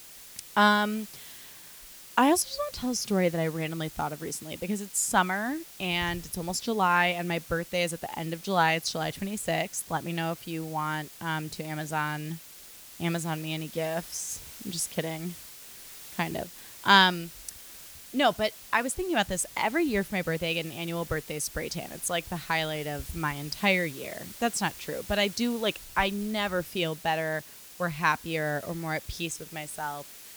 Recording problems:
hiss; noticeable; throughout; 15 dB below the speech

